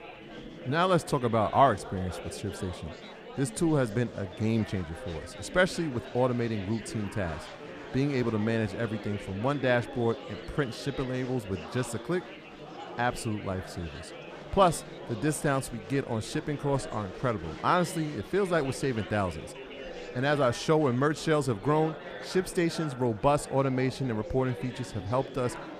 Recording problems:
chatter from many people; noticeable; throughout; 15 dB below the speech

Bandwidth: 14.5 kHz